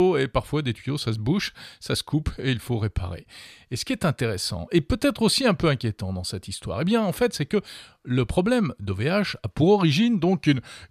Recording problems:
abrupt cut into speech; at the start

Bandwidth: 14 kHz